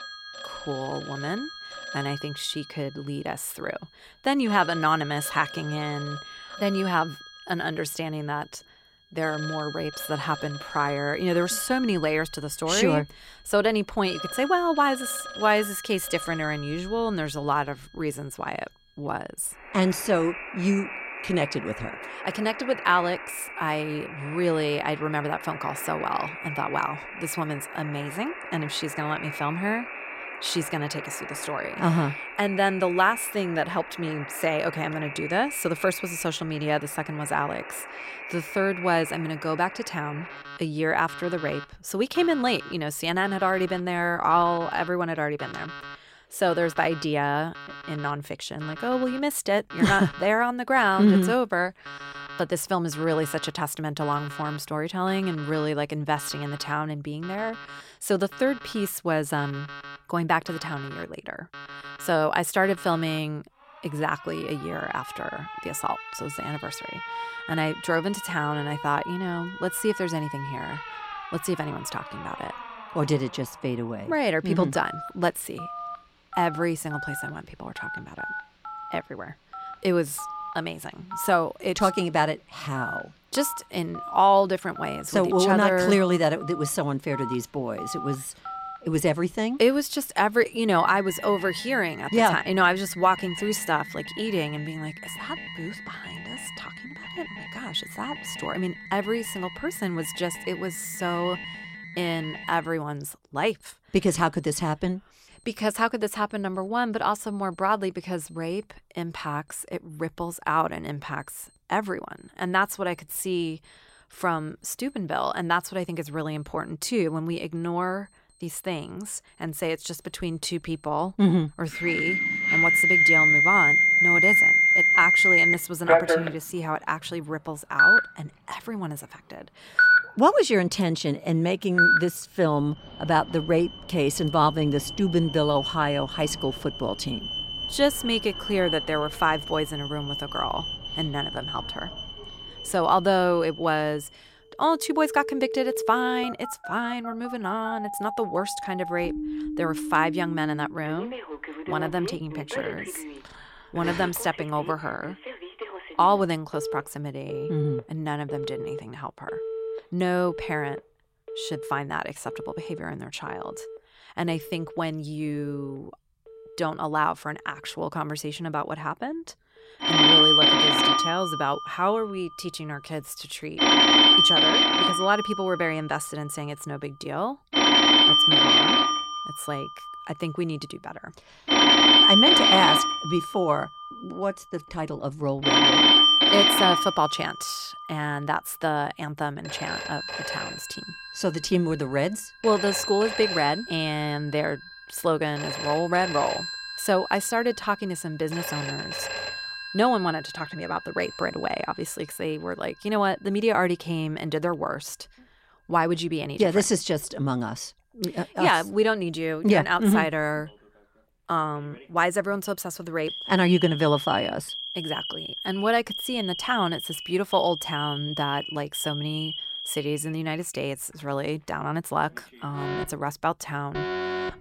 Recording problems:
alarms or sirens; very loud; throughout; 3 dB above the speech

